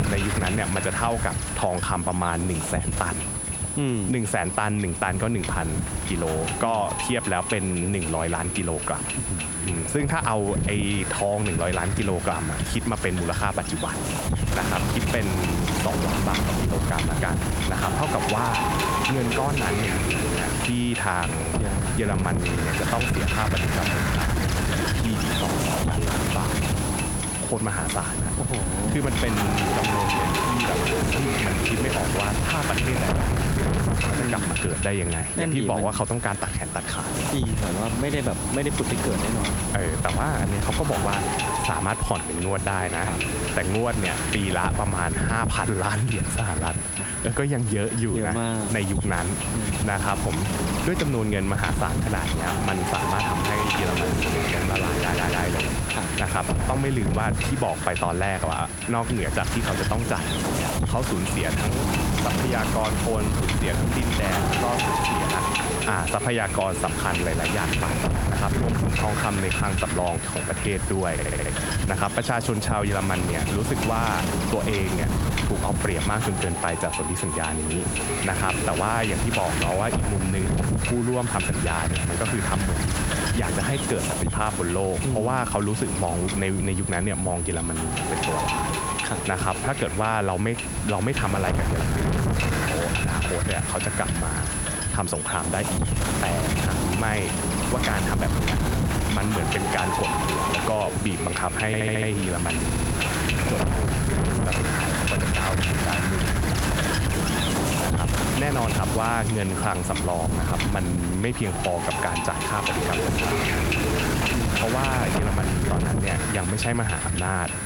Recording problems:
squashed, flat; somewhat
wind noise on the microphone; heavy; as loud as the speech
high-pitched whine; loud; throughout; 10 kHz, 7 dB below the speech
voice in the background; faint; throughout; 25 dB below the speech
audio stuttering; 4 times, first at 55 s

